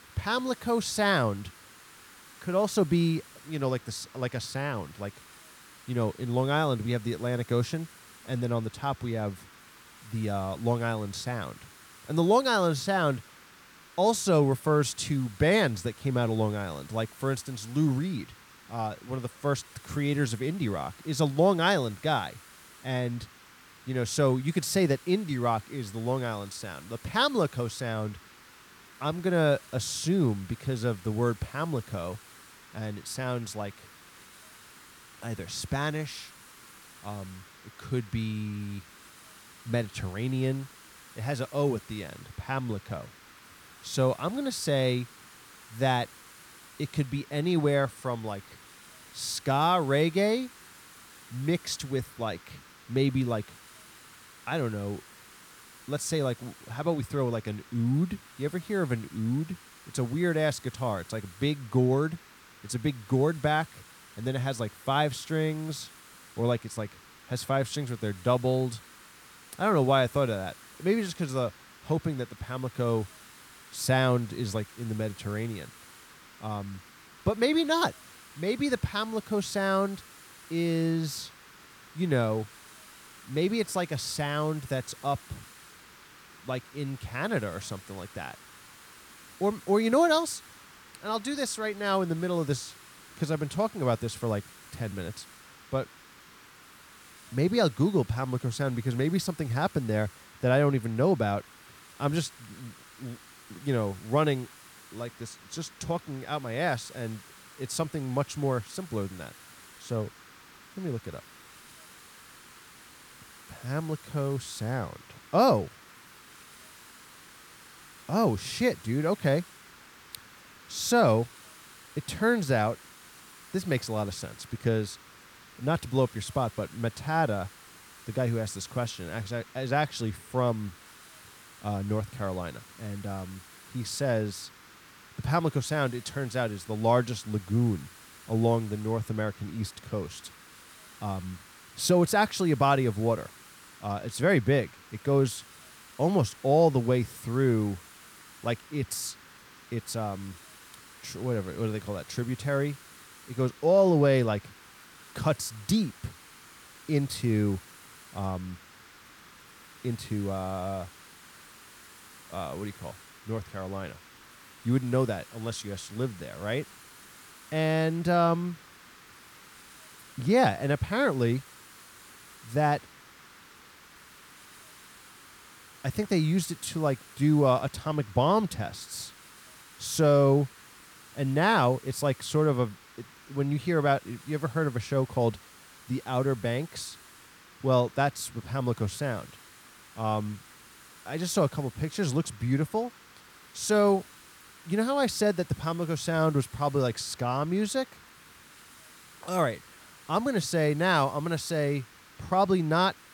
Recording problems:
hiss; faint; throughout; 20 dB below the speech

